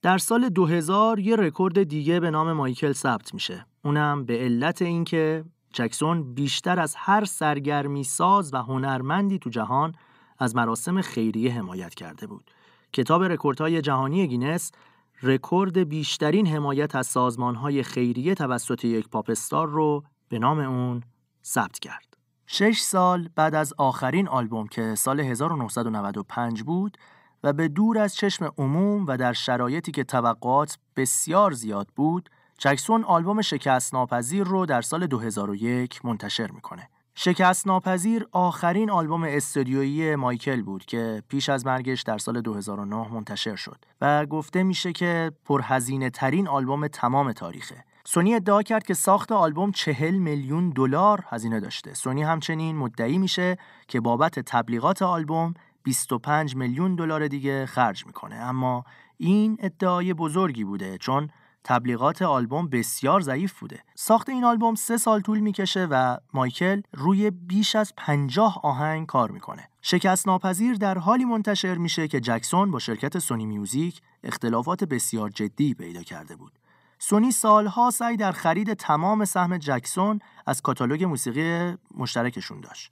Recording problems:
none

